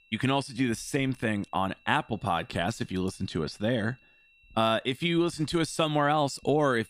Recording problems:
high-pitched whine; faint; throughout; 2.5 kHz, 30 dB below the speech

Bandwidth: 15 kHz